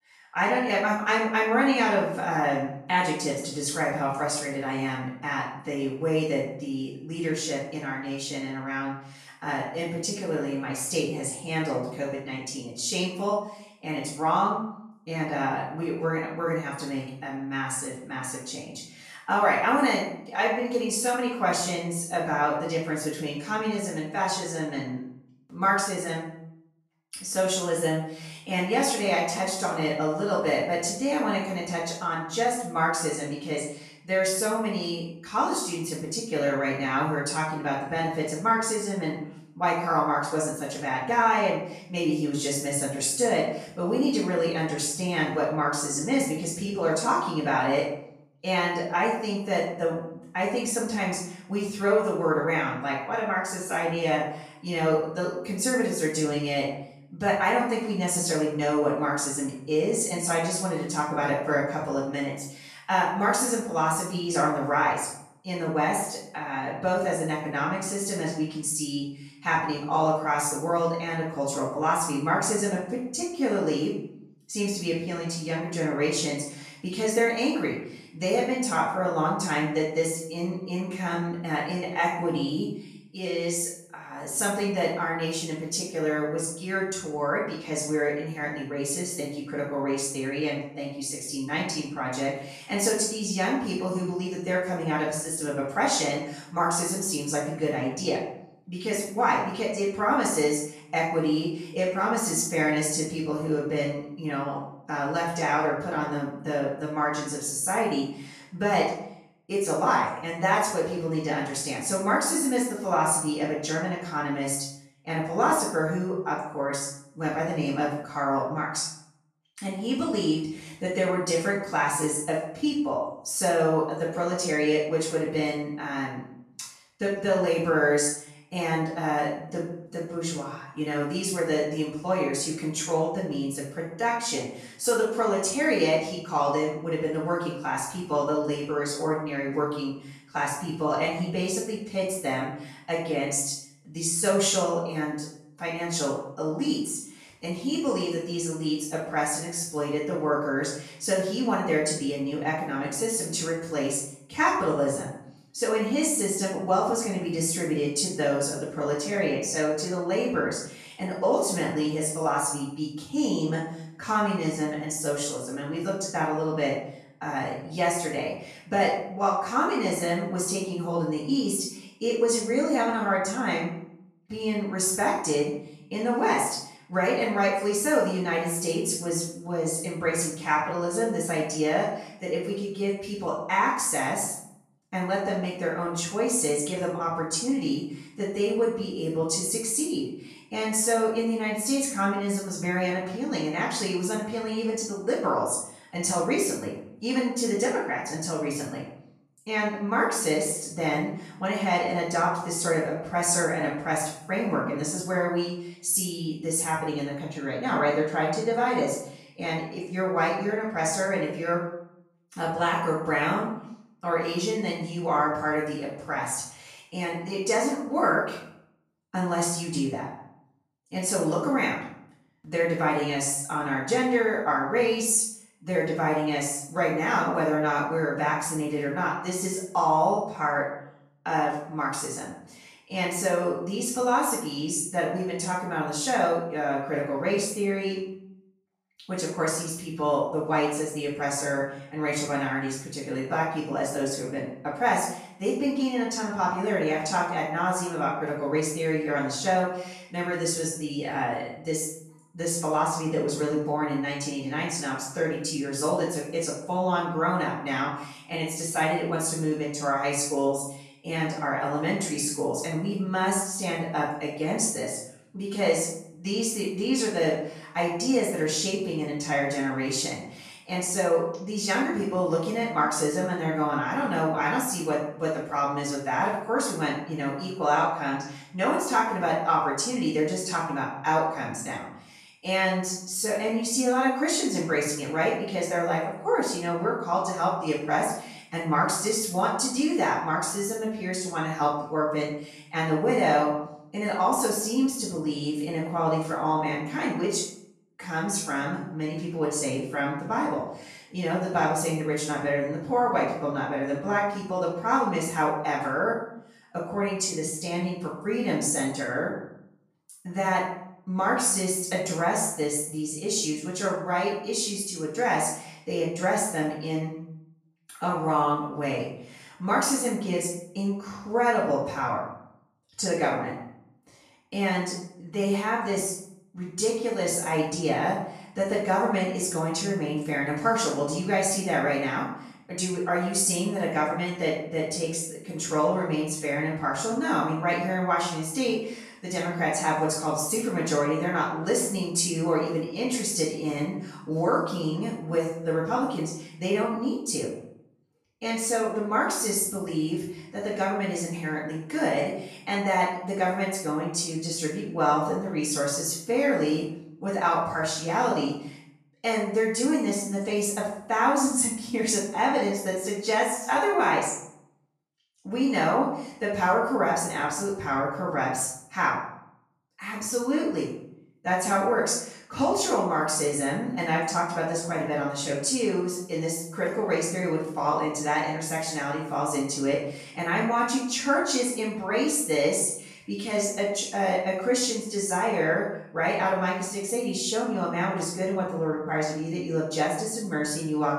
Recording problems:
off-mic speech; far
room echo; noticeable; dies away in 0.6 s

